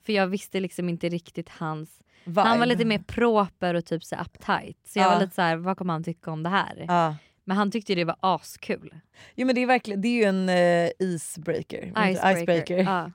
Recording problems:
none

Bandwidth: 16 kHz